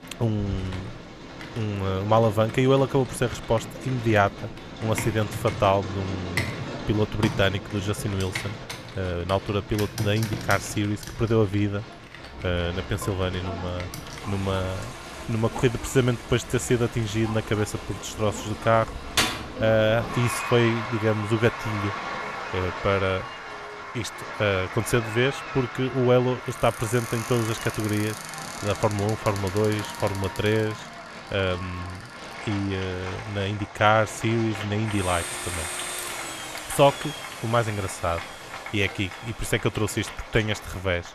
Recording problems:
crowd noise; noticeable; throughout; 10 dB below the speech
household noises; noticeable; throughout; 10 dB below the speech

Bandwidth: 13.5 kHz